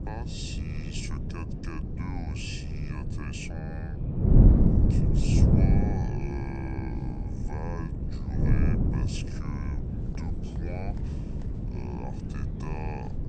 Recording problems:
wrong speed and pitch; too slow and too low; 0.7 times normal speed
wind noise on the microphone; heavy; 3 dB above the speech
murmuring crowd; faint; throughout; 20 dB below the speech

